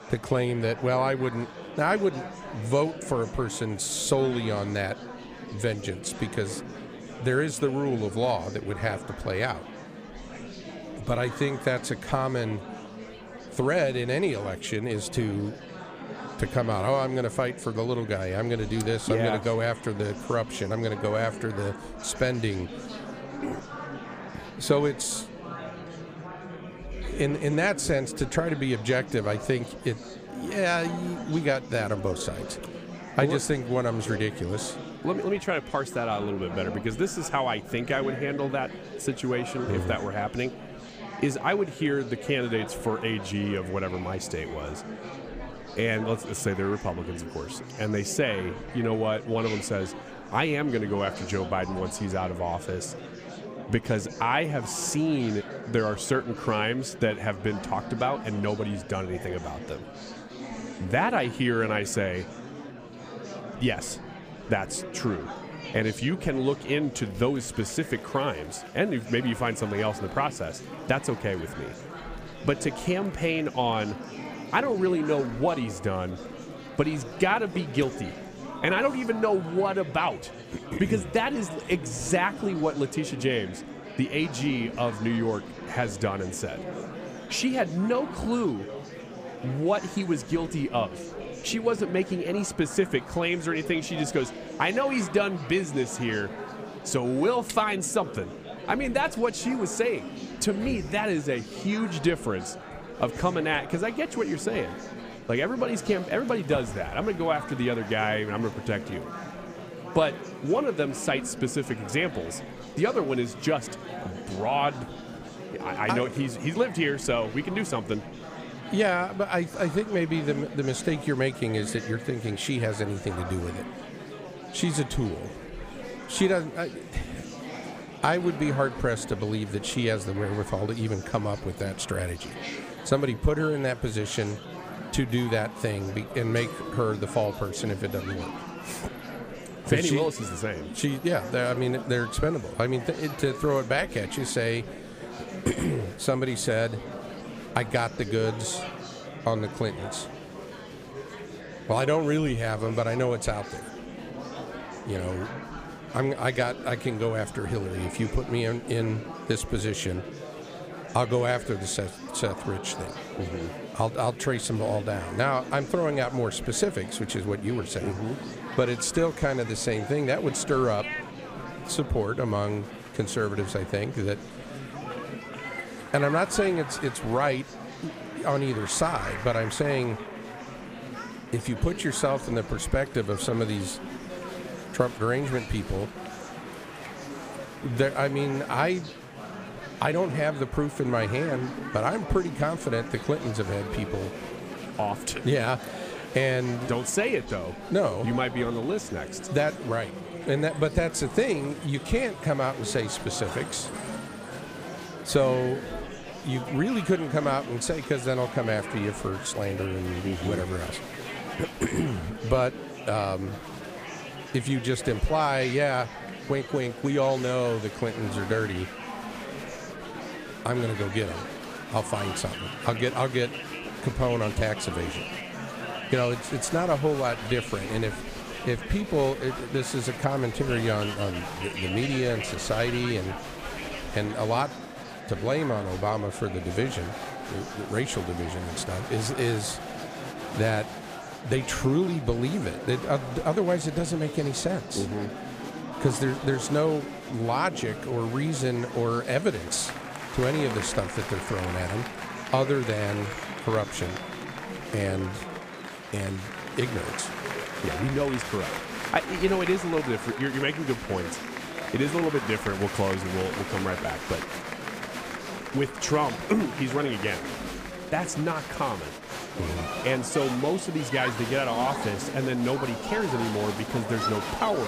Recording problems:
murmuring crowd; loud; throughout; 9 dB below the speech
abrupt cut into speech; at the end

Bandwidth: 15 kHz